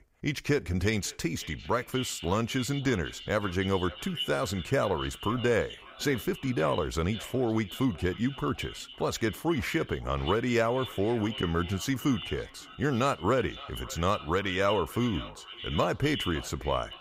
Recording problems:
echo of what is said; strong; throughout; 560 ms later, 10 dB below the speech

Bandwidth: 15.5 kHz